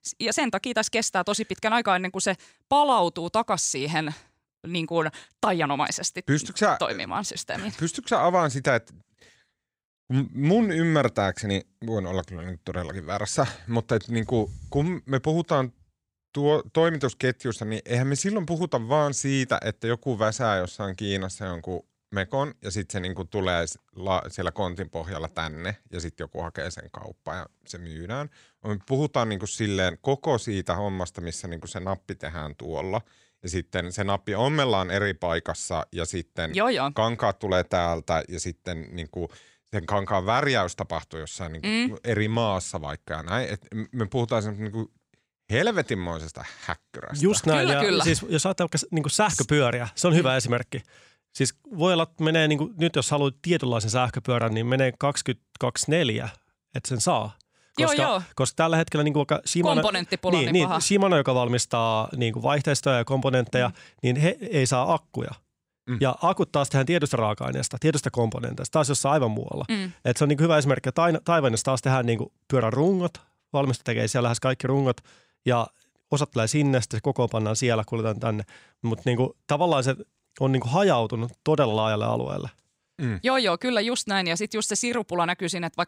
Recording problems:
none

